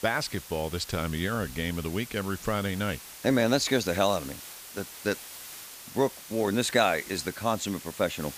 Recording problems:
hiss; noticeable; throughout; 15 dB below the speech

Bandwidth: 15 kHz